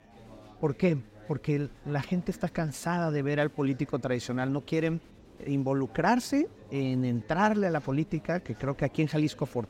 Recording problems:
chatter from many people; faint; throughout; 20 dB below the speech

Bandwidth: 16 kHz